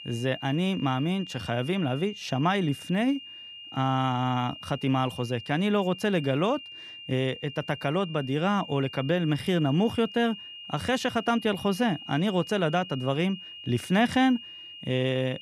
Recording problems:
high-pitched whine; noticeable; throughout; 3 kHz, 15 dB below the speech

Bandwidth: 15 kHz